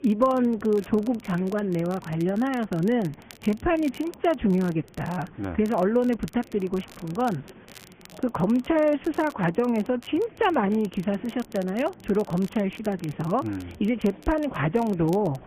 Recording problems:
garbled, watery; badly
high frequencies cut off; severe; nothing above 3 kHz
chatter from many people; faint; throughout; 25 dB below the speech
crackle, like an old record; faint; 25 dB below the speech

